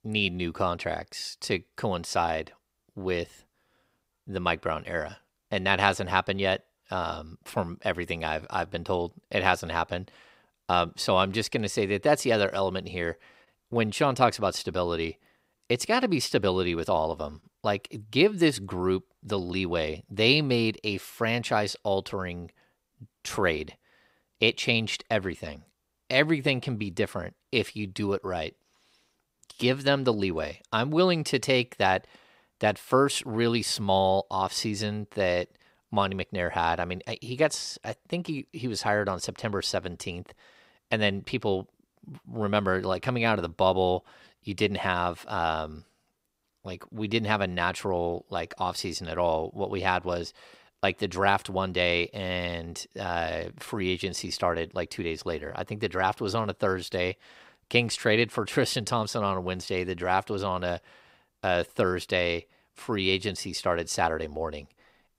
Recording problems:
none

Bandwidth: 15.5 kHz